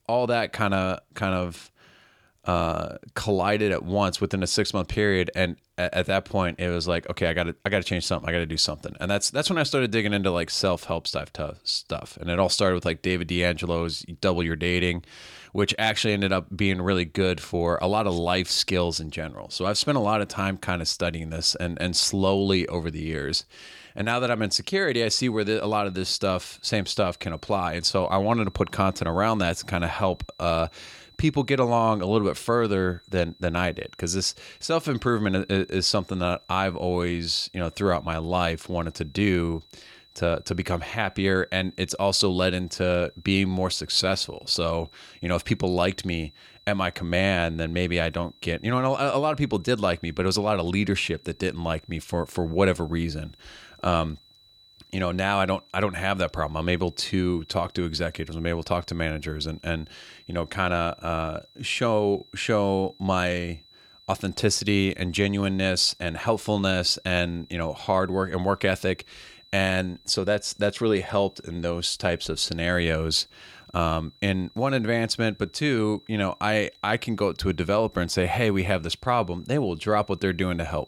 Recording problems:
high-pitched whine; faint; from 25 s on; 4 kHz, 25 dB below the speech

